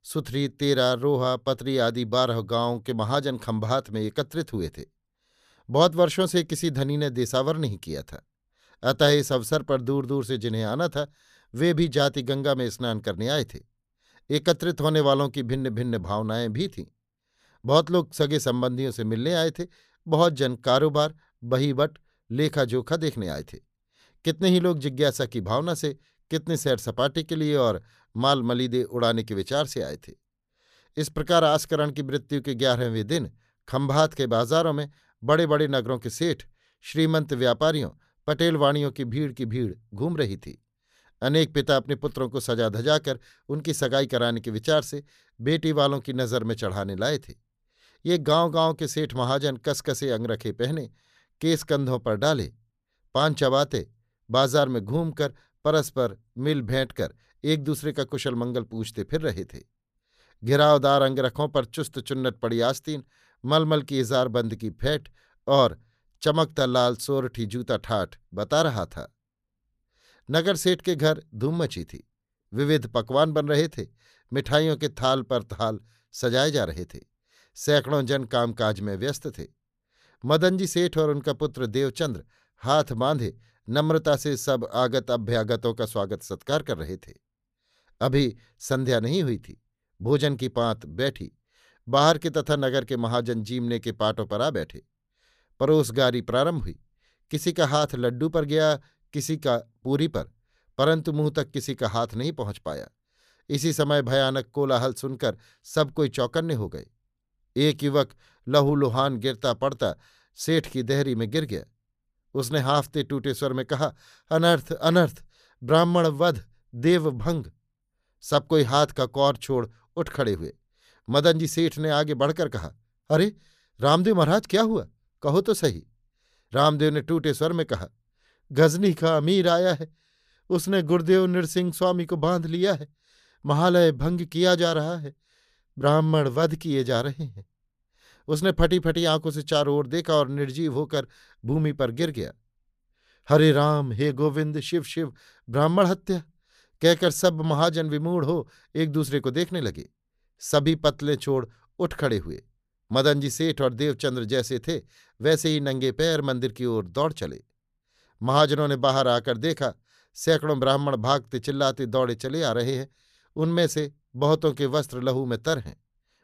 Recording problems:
none

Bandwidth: 14.5 kHz